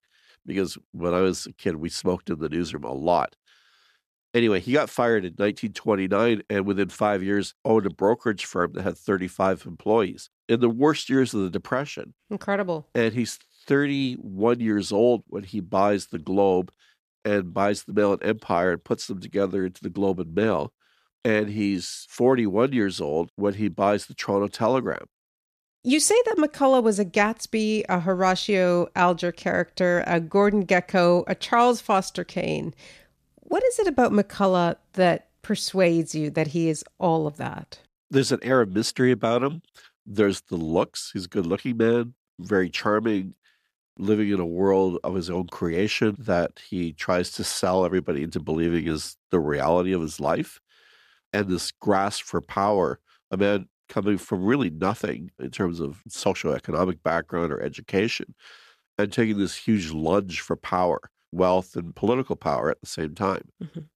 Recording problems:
none

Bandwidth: 14.5 kHz